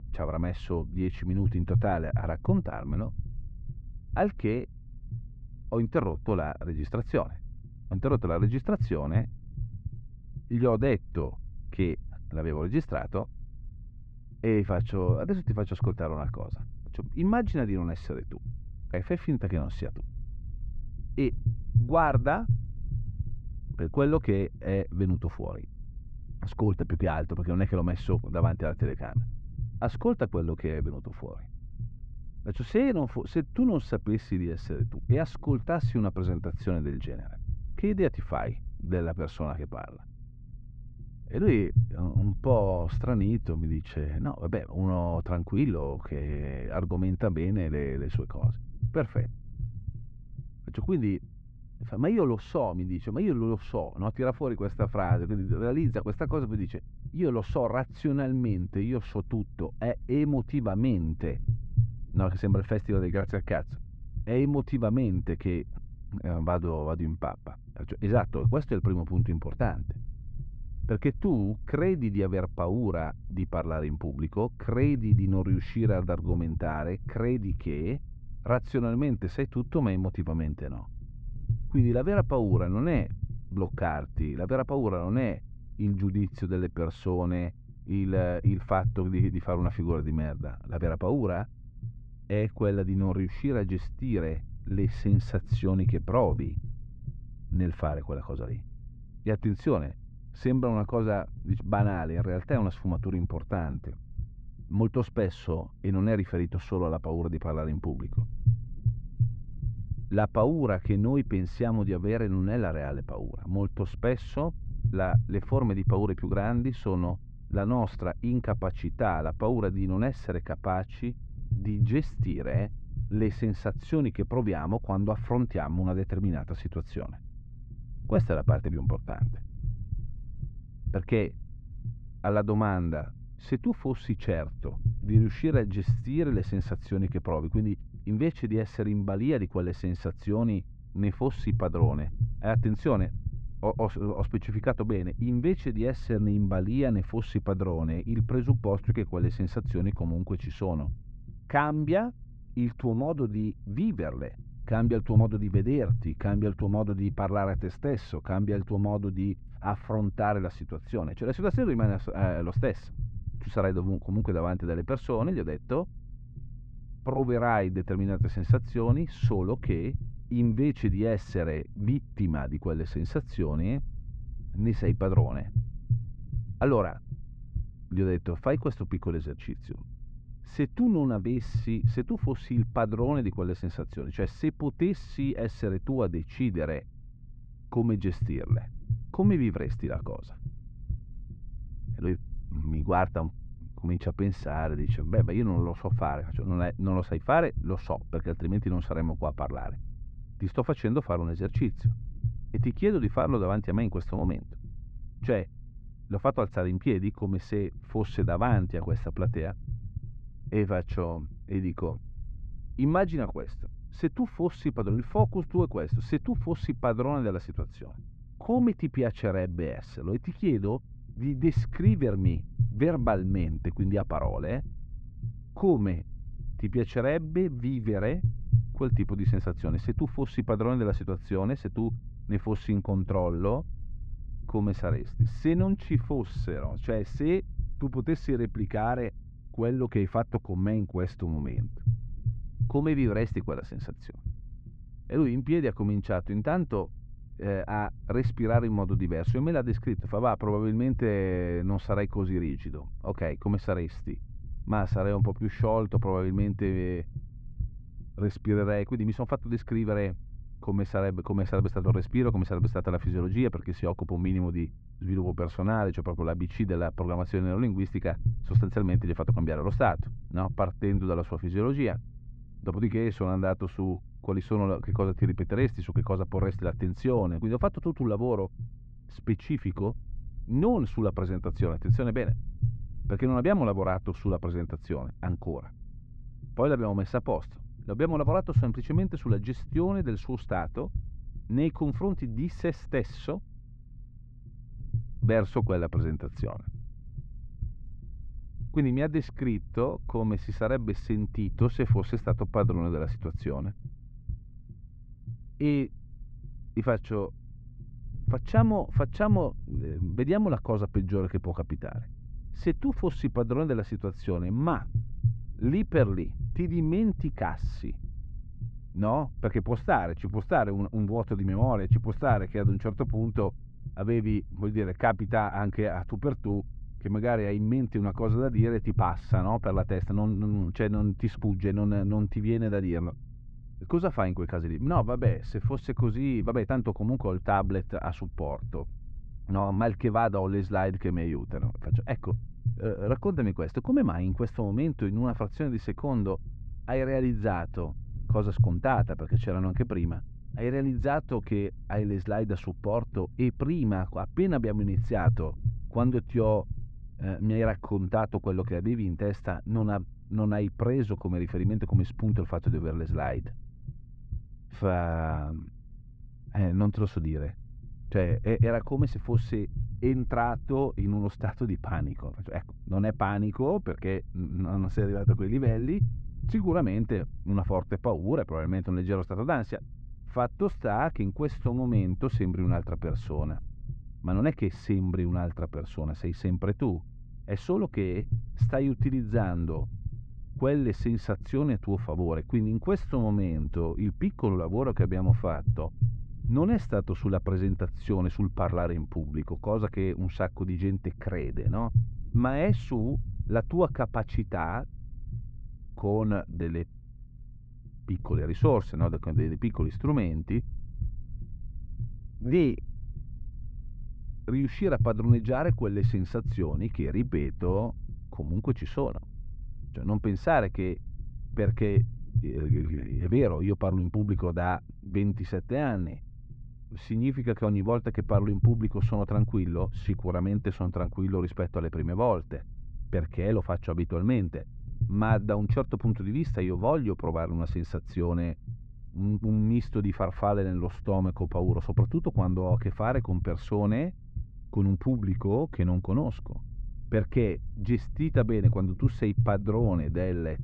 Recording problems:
muffled; very; fading above 2 kHz
low rumble; noticeable; throughout; 15 dB below the speech

